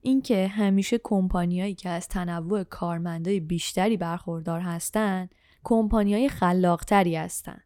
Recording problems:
none

